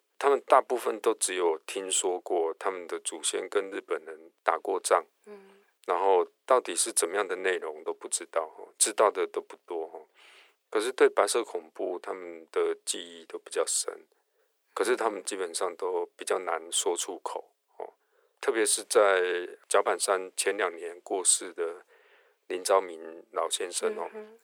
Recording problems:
thin; very; fading below 400 Hz

